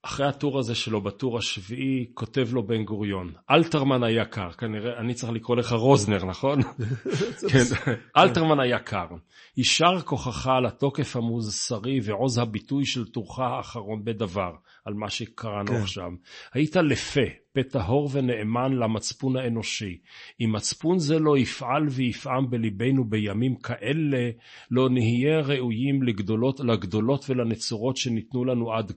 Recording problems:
garbled, watery; slightly; nothing above 8 kHz

